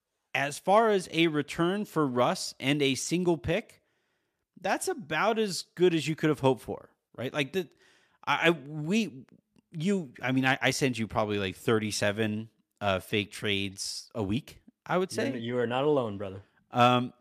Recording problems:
none

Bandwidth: 14.5 kHz